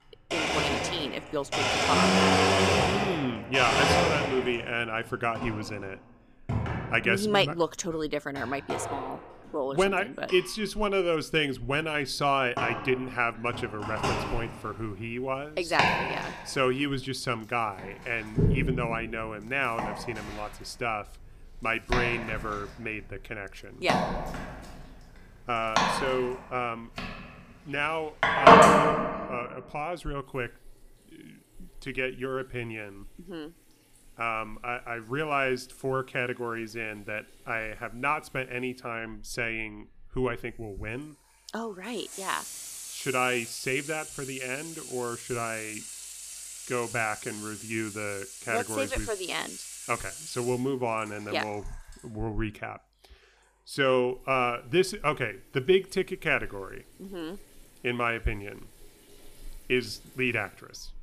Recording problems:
household noises; very loud; throughout; 3 dB above the speech

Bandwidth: 15 kHz